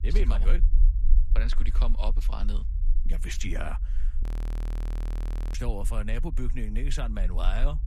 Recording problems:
low rumble; noticeable; throughout; 10 dB below the speech
audio freezing; at 4 s for 1.5 s

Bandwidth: 14.5 kHz